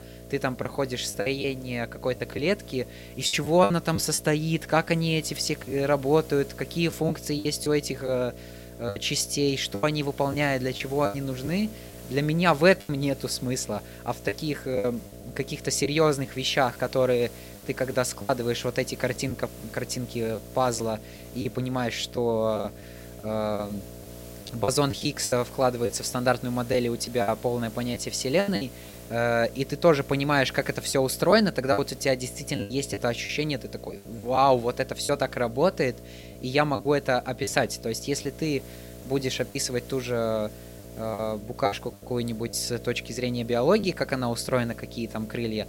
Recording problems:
electrical hum; faint; throughout; 60 Hz, 20 dB below the speech
hiss; faint; throughout; 25 dB below the speech
choppy; very; 7% of the speech affected

